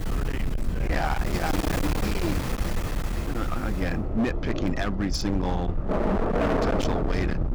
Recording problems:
distortion; heavy; 31% of the sound clipped
rain or running water; very loud; throughout; as loud as the speech
low rumble; loud; throughout; 7 dB below the speech

